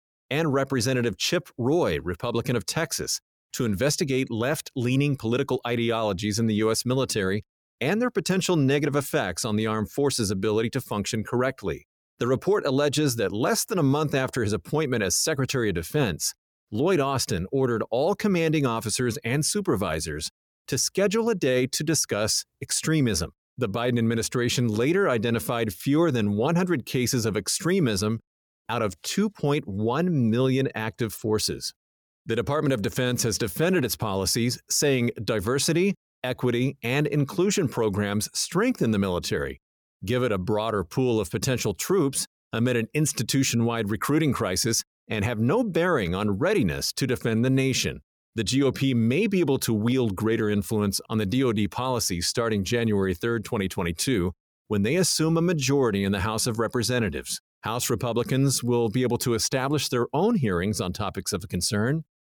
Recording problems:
none

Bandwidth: 18.5 kHz